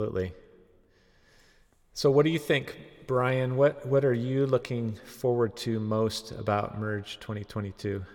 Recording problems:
echo of what is said; faint; throughout; 130 ms later, 20 dB below the speech
abrupt cut into speech; at the start

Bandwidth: 18 kHz